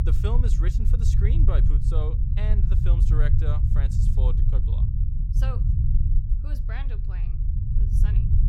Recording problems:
low rumble; loud; throughout; 1 dB below the speech

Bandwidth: 16 kHz